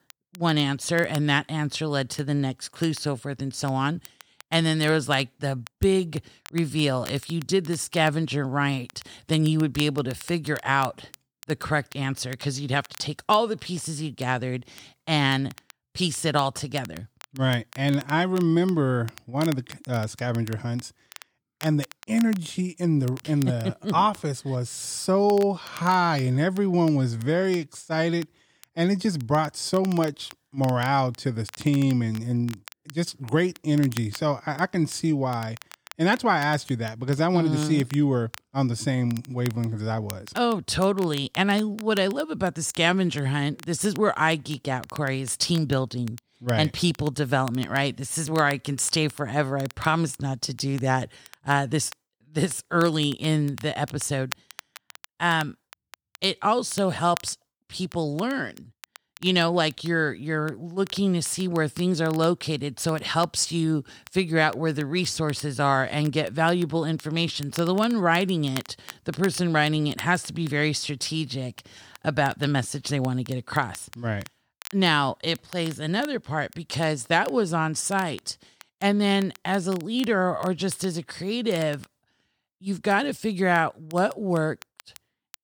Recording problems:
crackle, like an old record; faint; 20 dB below the speech

